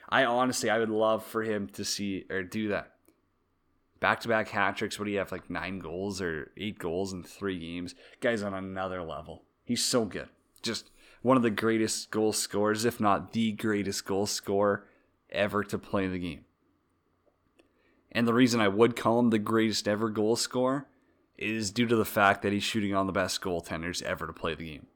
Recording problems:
none

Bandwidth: 18.5 kHz